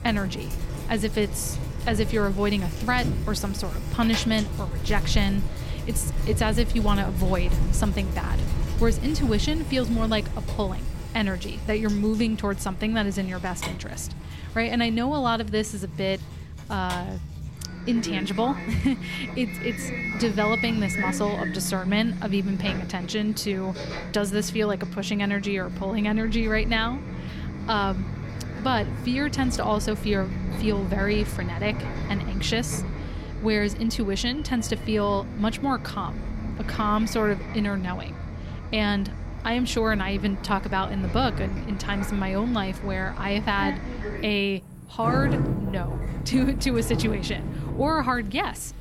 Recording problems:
traffic noise; loud; throughout; 5 dB below the speech

